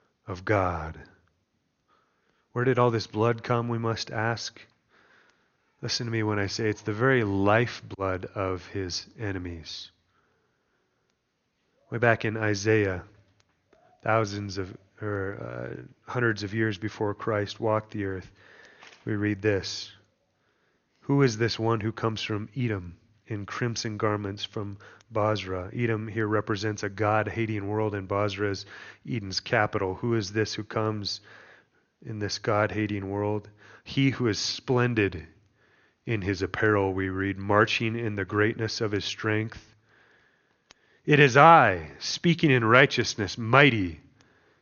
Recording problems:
high frequencies cut off; noticeable; nothing above 6.5 kHz

